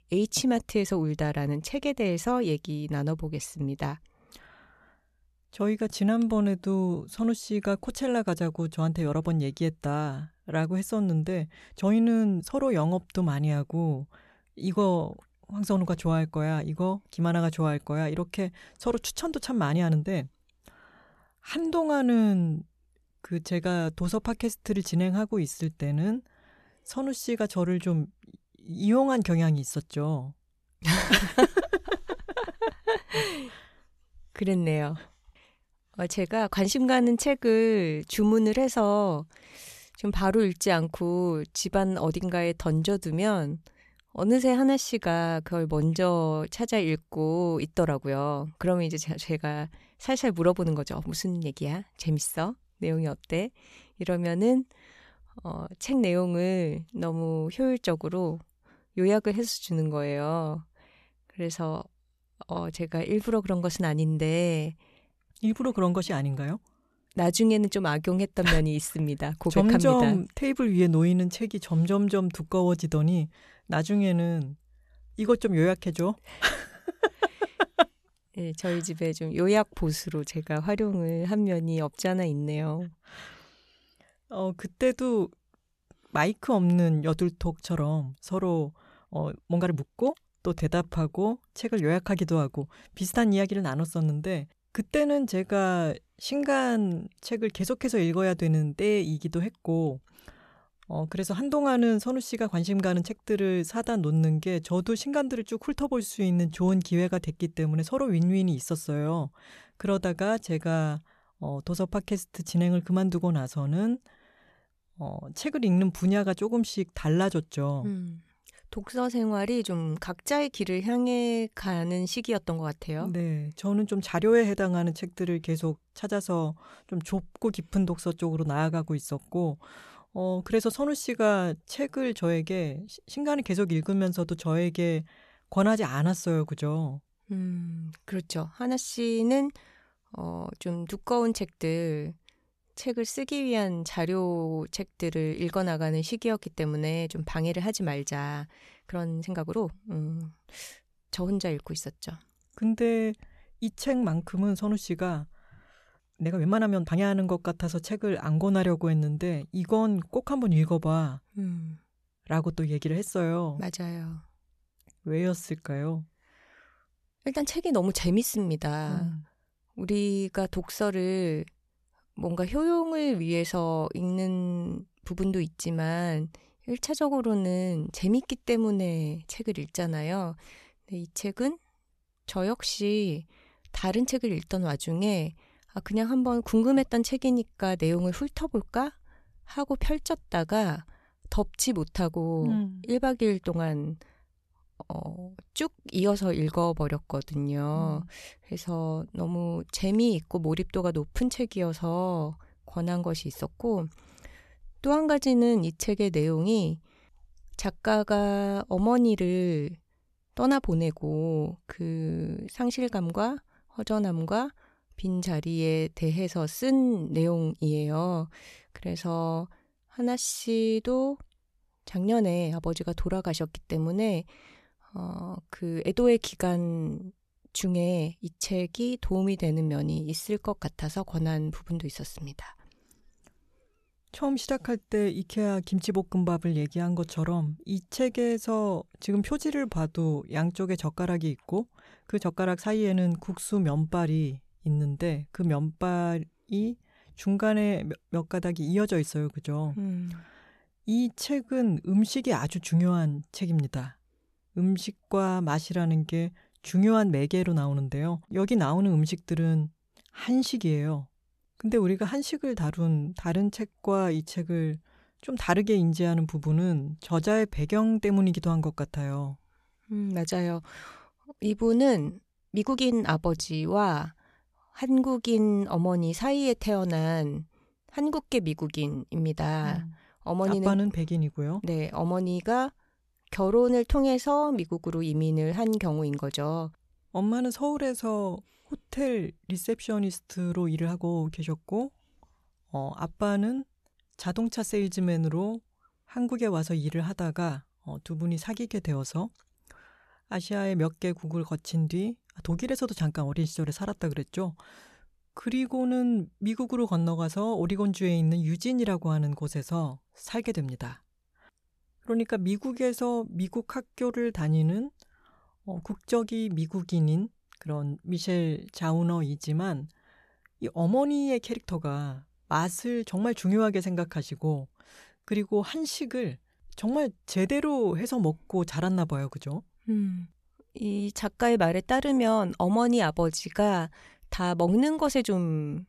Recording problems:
uneven, jittery; strongly; from 12 s to 5:34

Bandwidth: 13.5 kHz